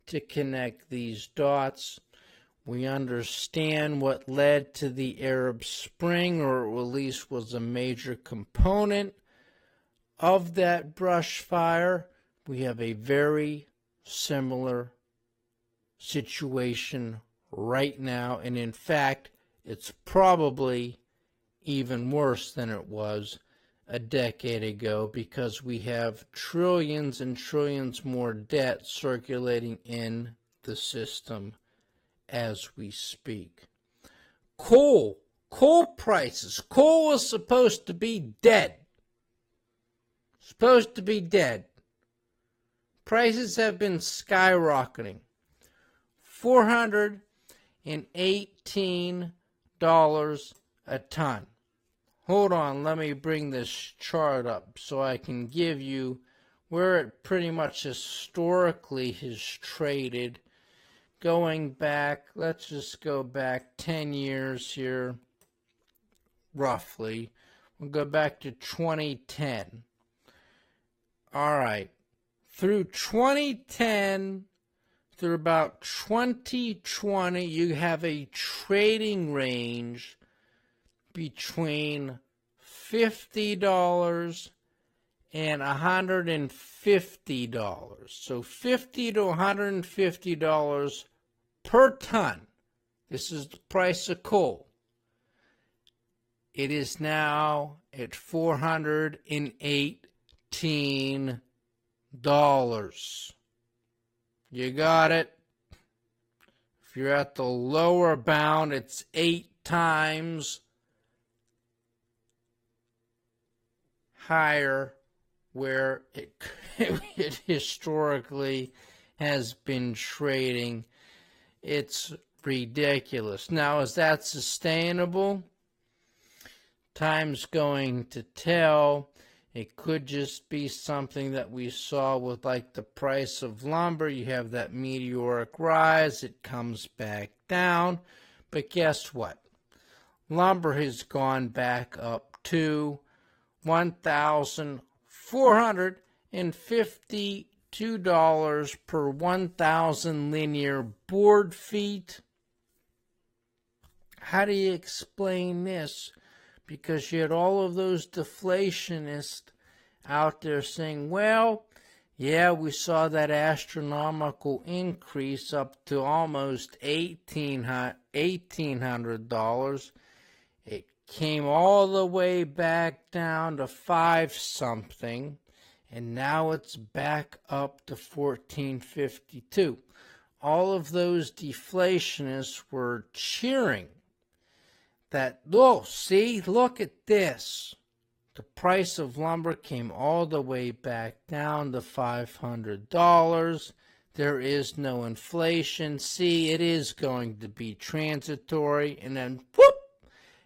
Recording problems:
wrong speed, natural pitch; too slow; 0.6 times normal speed
garbled, watery; slightly; nothing above 15.5 kHz

